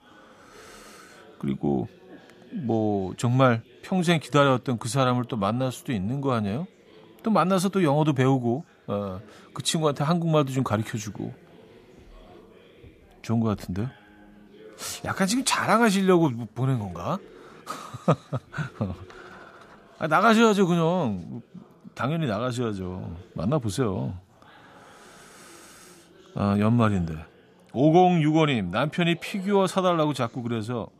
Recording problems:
chatter from many people; faint; throughout; 30 dB below the speech

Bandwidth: 14.5 kHz